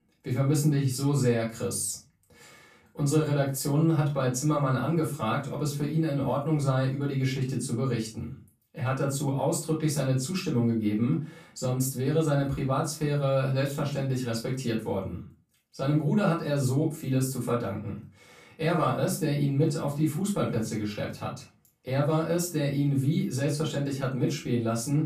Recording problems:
off-mic speech; far
room echo; slight; dies away in 0.3 s

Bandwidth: 14.5 kHz